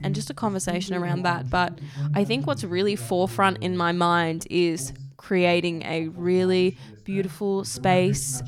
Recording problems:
voice in the background; noticeable; throughout; 10 dB below the speech

